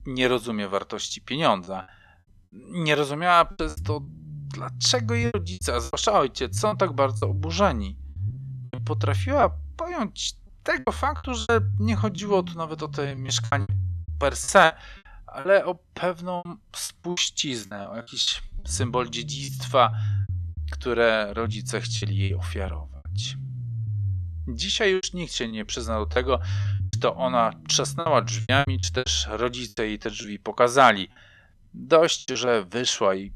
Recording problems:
low rumble; faint; throughout; 20 dB below the speech
choppy; very; 11% of the speech affected

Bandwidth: 13.5 kHz